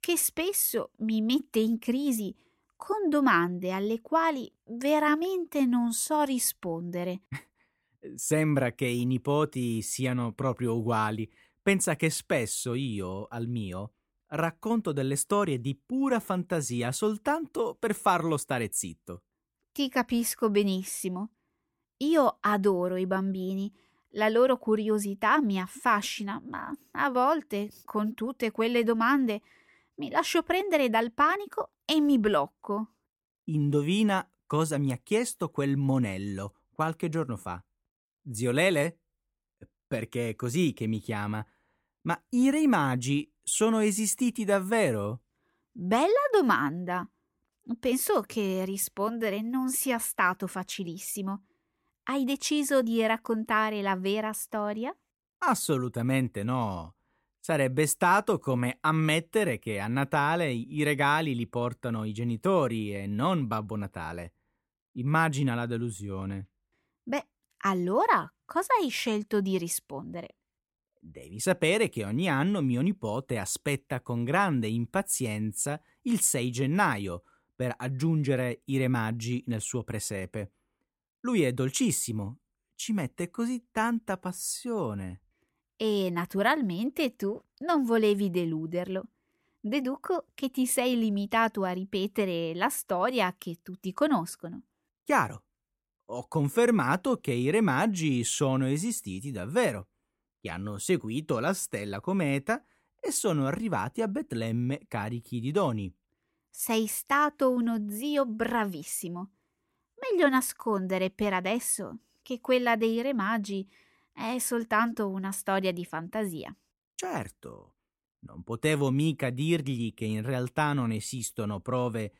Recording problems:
none

